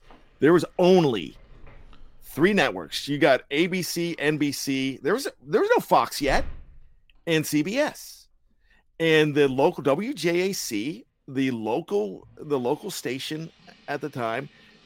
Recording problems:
household noises; faint; throughout; 25 dB below the speech

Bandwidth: 16 kHz